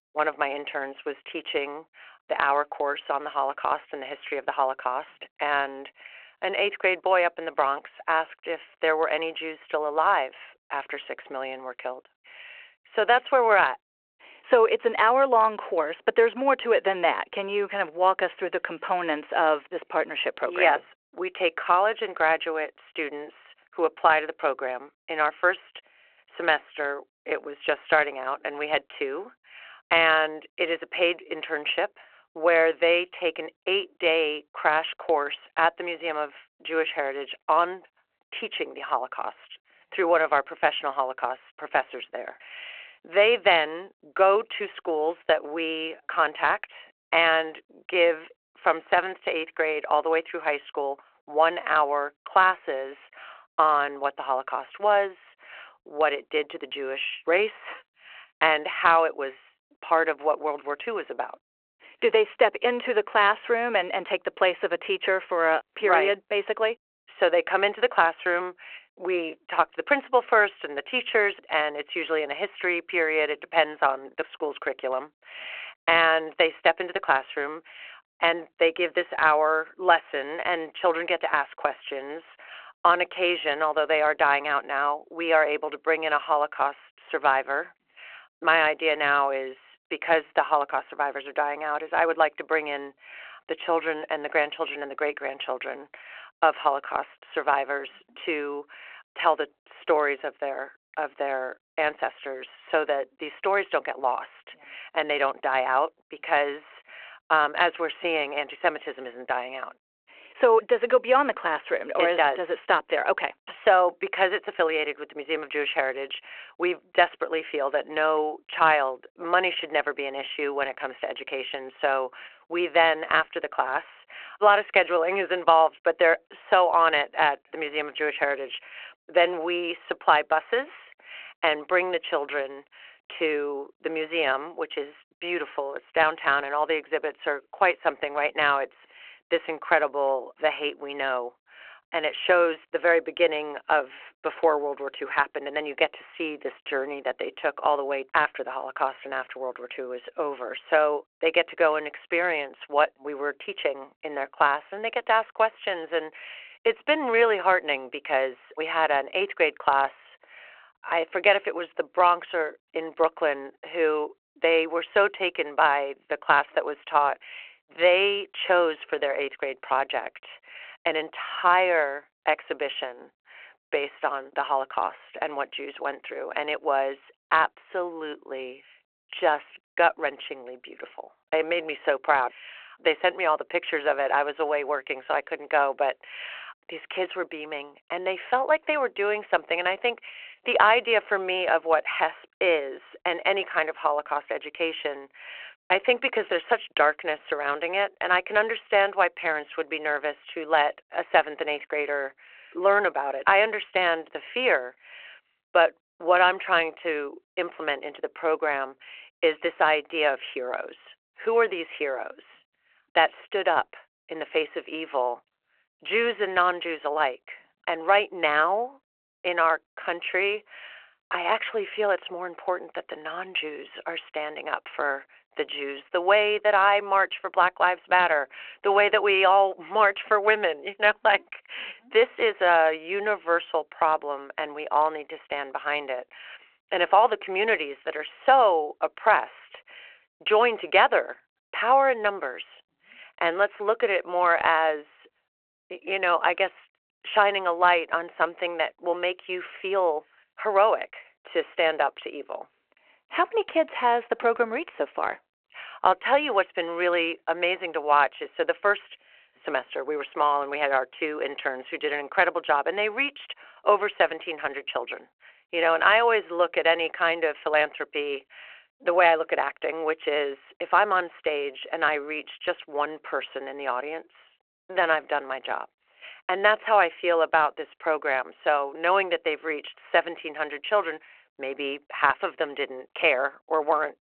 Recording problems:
phone-call audio

